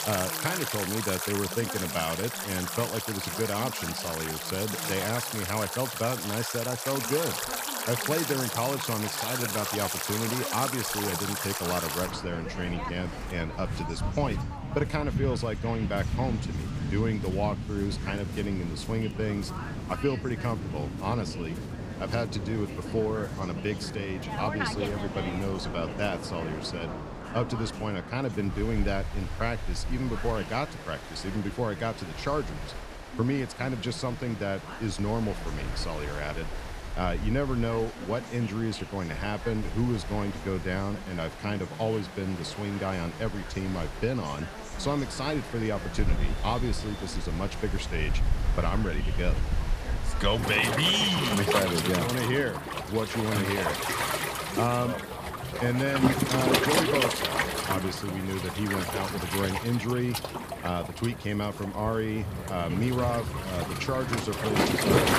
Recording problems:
rain or running water; loud; throughout; 2 dB below the speech
voice in the background; noticeable; throughout; 15 dB below the speech

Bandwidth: 15 kHz